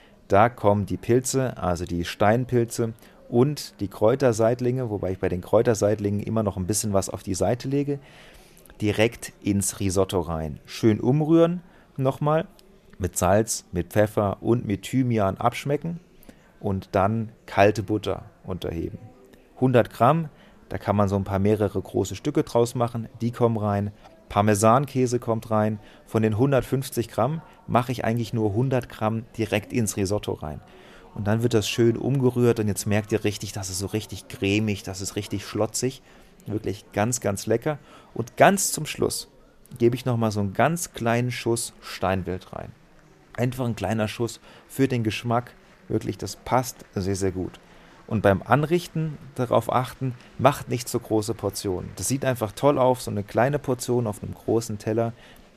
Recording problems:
murmuring crowd; faint; throughout; 30 dB below the speech

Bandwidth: 14.5 kHz